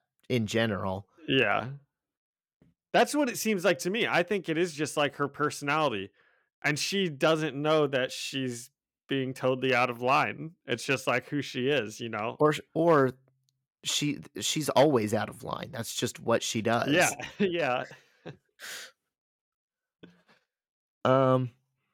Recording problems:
none

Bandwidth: 17 kHz